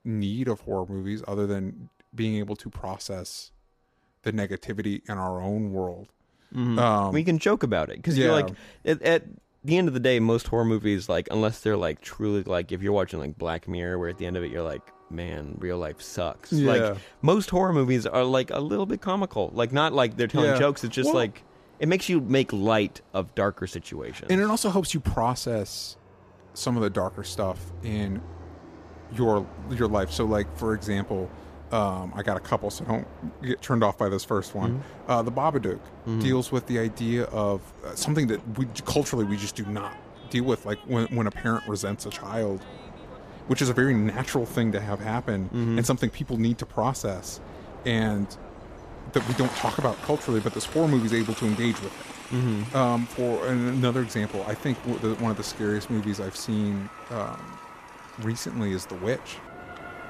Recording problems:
train or aircraft noise; noticeable; throughout; 15 dB below the speech

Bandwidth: 14.5 kHz